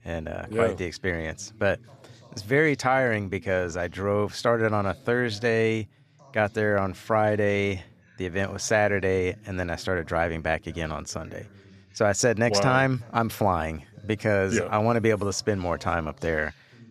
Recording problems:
voice in the background; faint; throughout; 25 dB below the speech

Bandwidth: 14.5 kHz